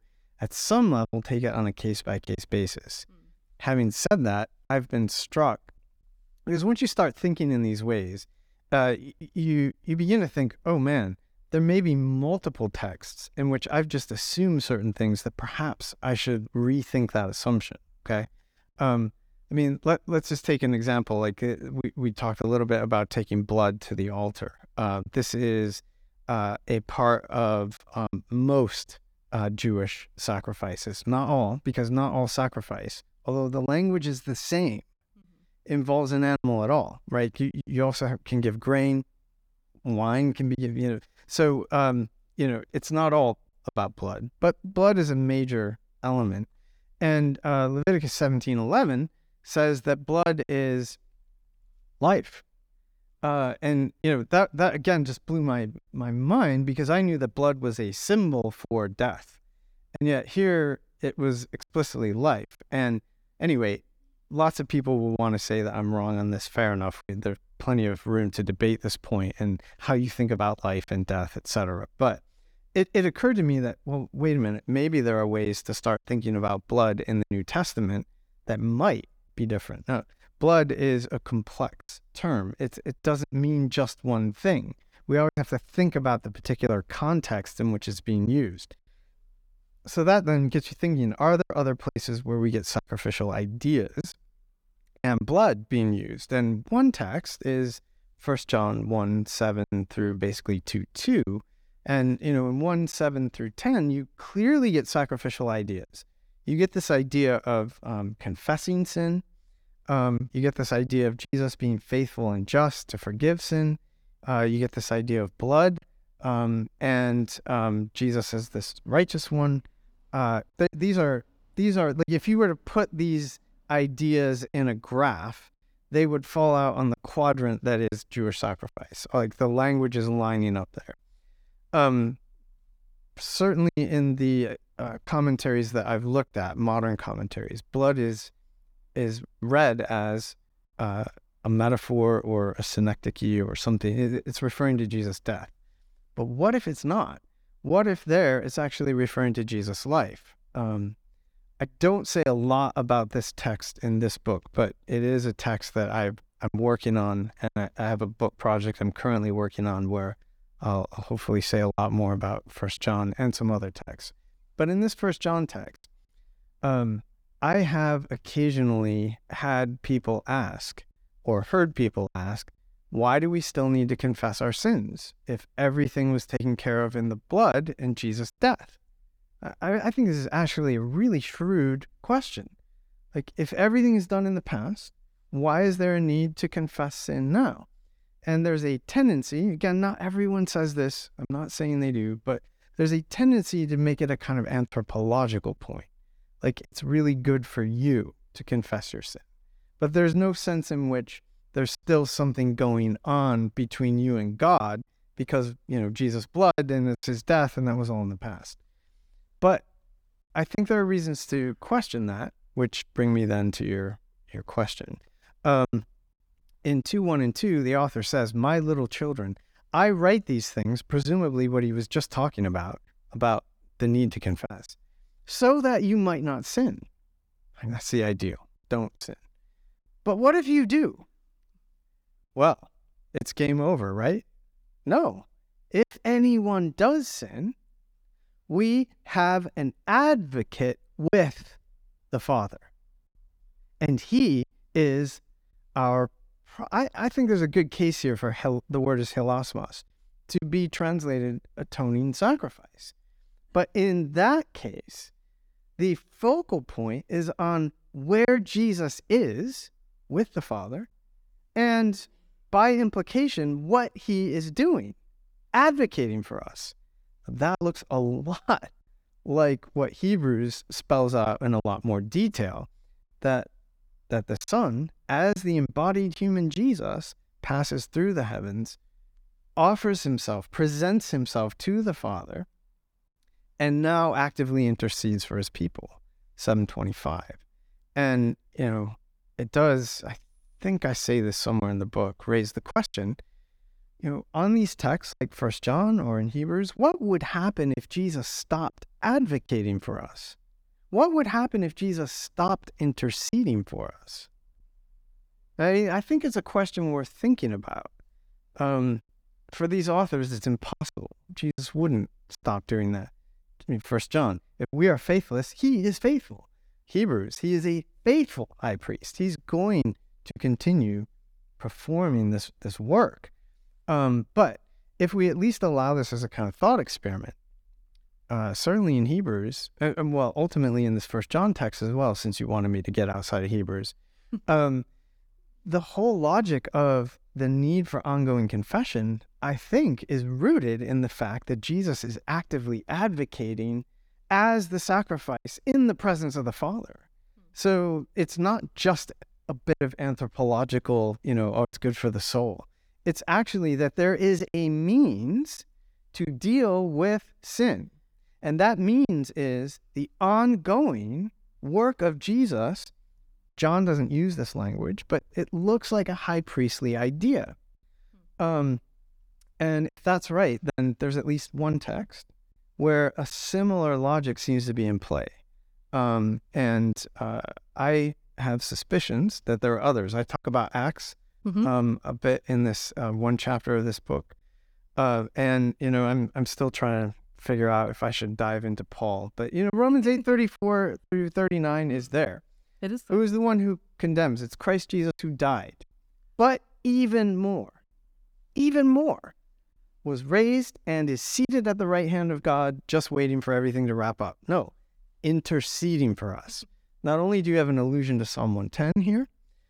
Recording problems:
choppy; occasionally; 2% of the speech affected

